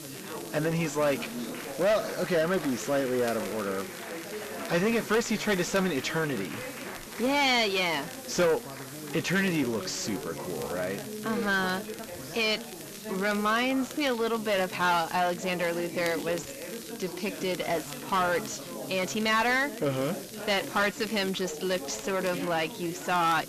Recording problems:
distortion; heavy; 6 dB below the speech
high frequencies cut off; noticeable; nothing above 8 kHz
chatter from many people; noticeable; throughout; 10 dB below the speech
hiss; noticeable; throughout; 15 dB below the speech
crackle, like an old record; faint; 20 dB below the speech

